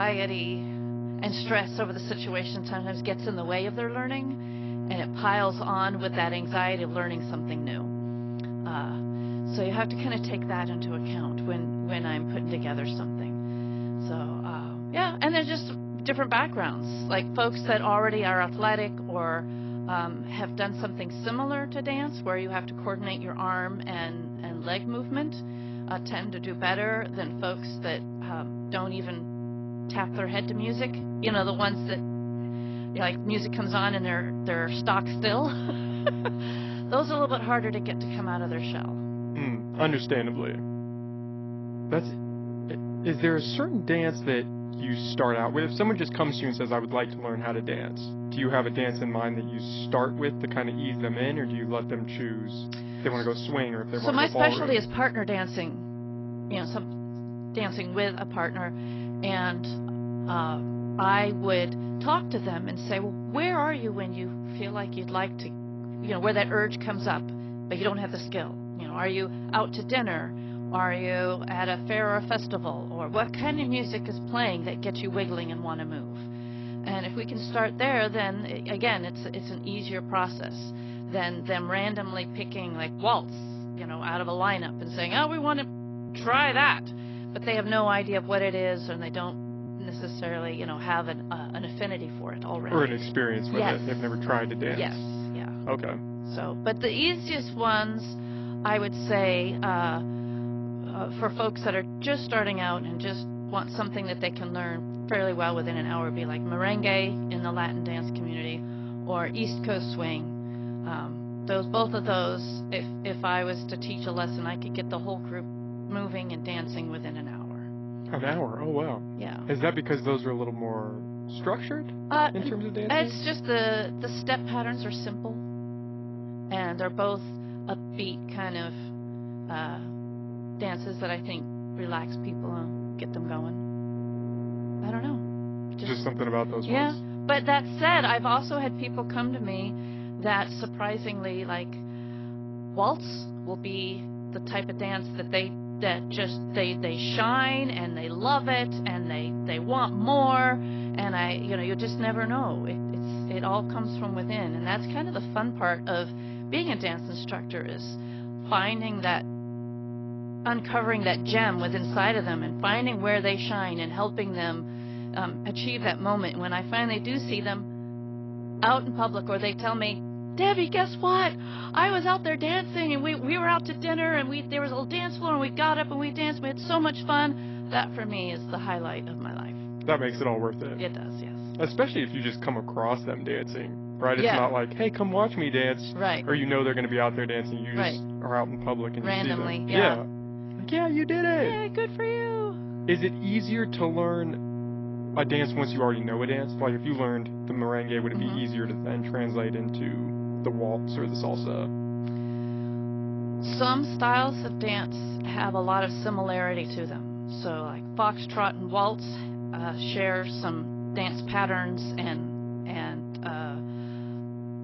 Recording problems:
garbled, watery; badly
high frequencies cut off; noticeable; nothing above 5.5 kHz
electrical hum; noticeable; throughout; 60 Hz, 10 dB below the speech
abrupt cut into speech; at the start
uneven, jittery; strongly; from 24 s to 3:25

